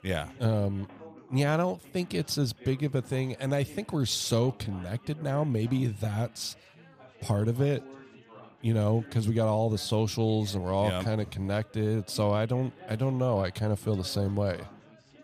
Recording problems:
background chatter; faint; throughout; 4 voices, 20 dB below the speech

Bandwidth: 15 kHz